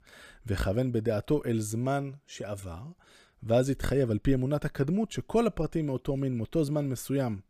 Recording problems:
none

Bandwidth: 15 kHz